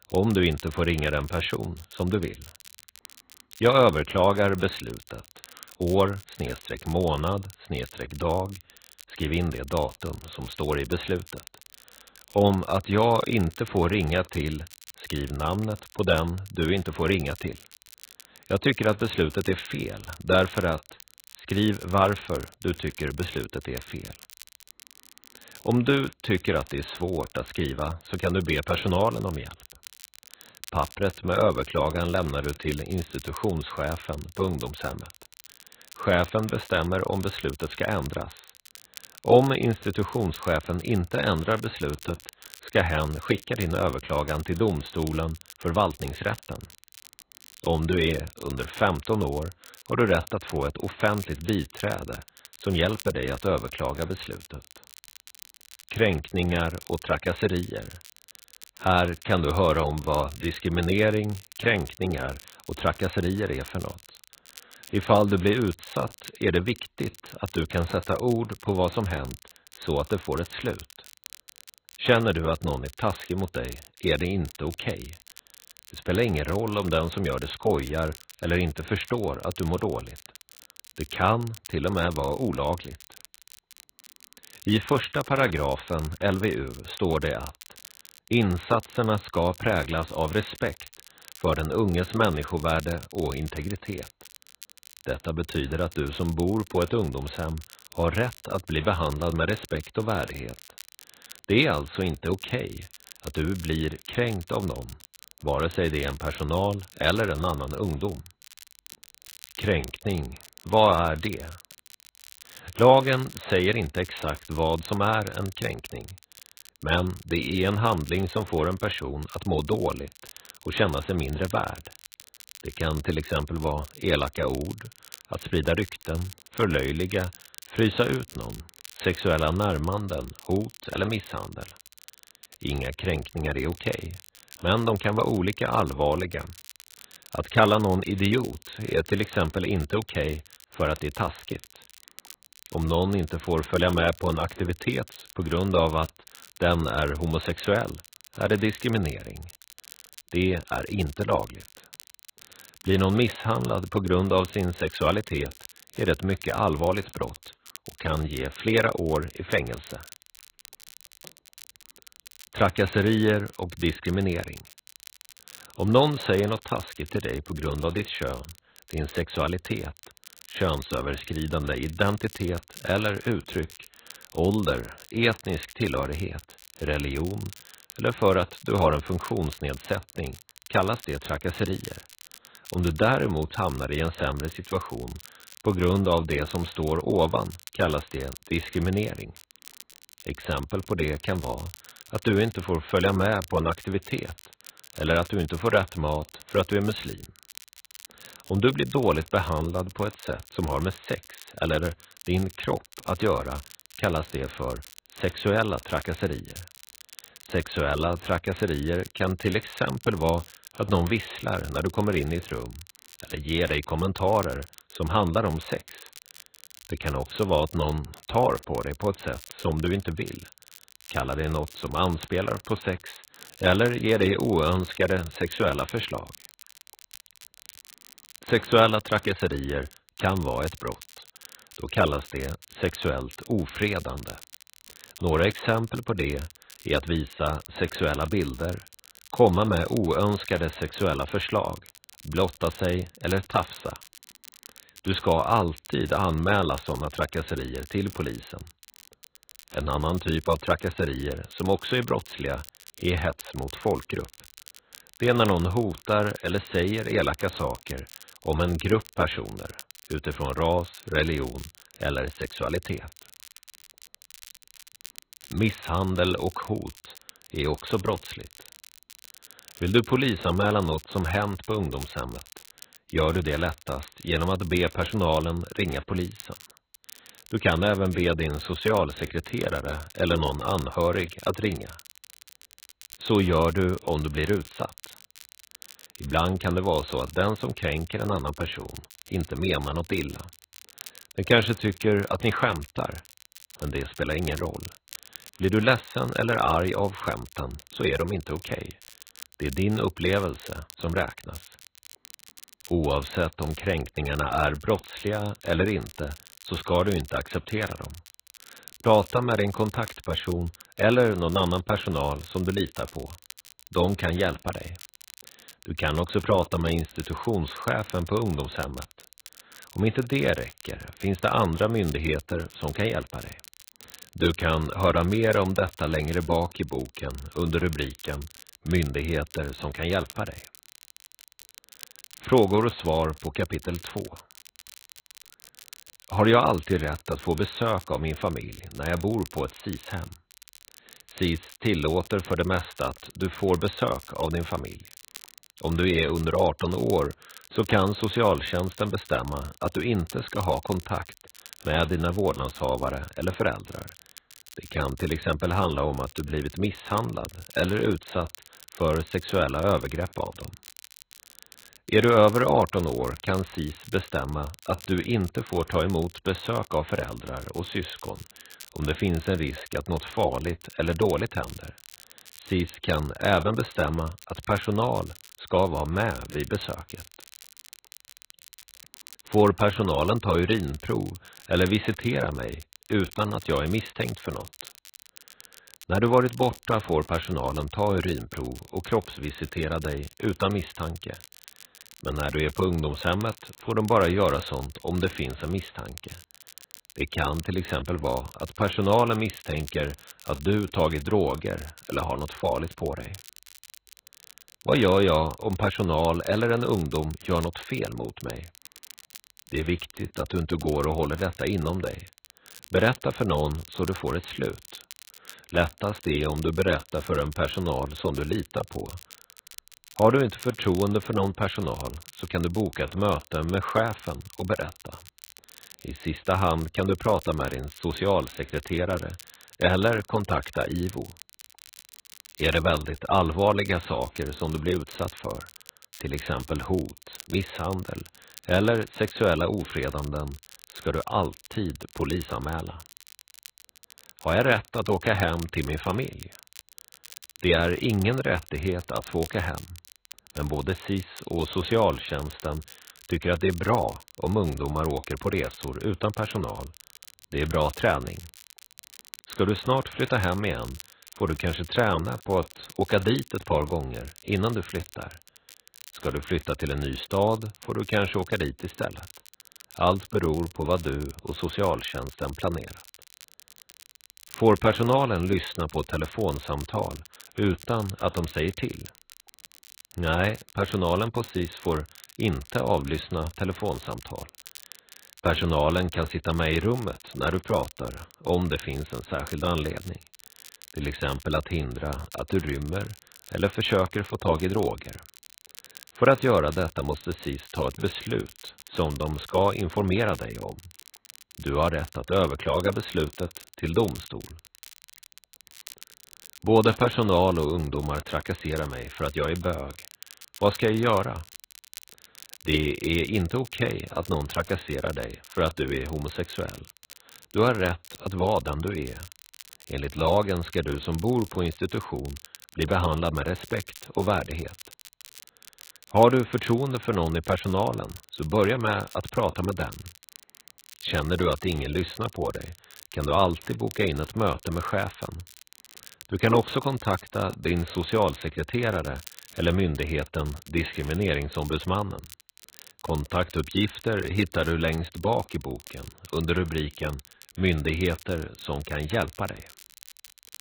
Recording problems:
garbled, watery; badly; nothing above 4 kHz
crackle, like an old record; faint; 20 dB below the speech

